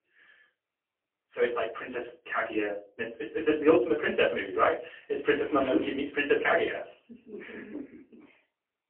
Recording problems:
phone-call audio; poor line
off-mic speech; far
room echo; very slight; dies away in 0.3 s

